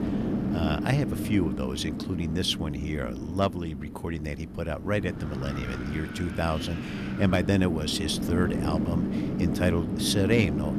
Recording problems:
wind noise on the microphone; heavy; 5 dB below the speech

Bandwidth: 14 kHz